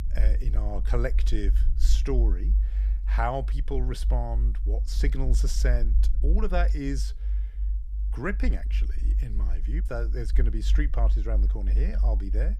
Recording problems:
low rumble; noticeable; throughout; 15 dB below the speech

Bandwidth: 15 kHz